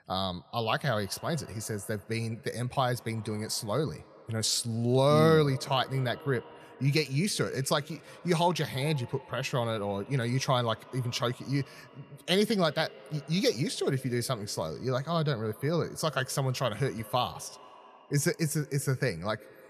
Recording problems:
echo of what is said; faint; throughout; 160 ms later, 20 dB below the speech

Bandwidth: 14 kHz